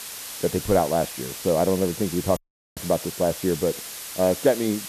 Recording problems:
muffled; very; fading above 1.5 kHz
hiss; loud; throughout; 9 dB below the speech
audio cutting out; at 2.5 s

